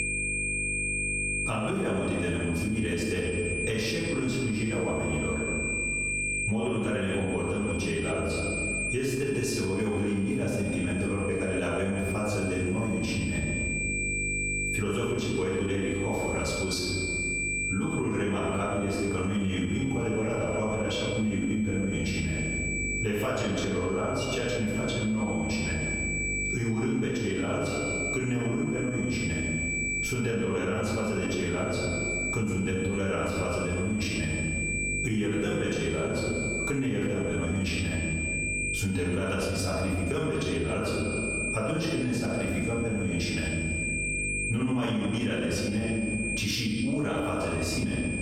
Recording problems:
off-mic speech; far
room echo; noticeable; dies away in 1.3 s
squashed, flat; somewhat
high-pitched whine; loud; throughout; 2.5 kHz, 4 dB below the speech
electrical hum; noticeable; throughout; 50 Hz, 20 dB below the speech

